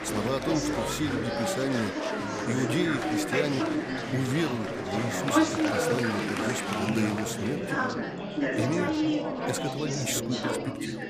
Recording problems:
chatter from many people; very loud; throughout; 3 dB above the speech

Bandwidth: 15 kHz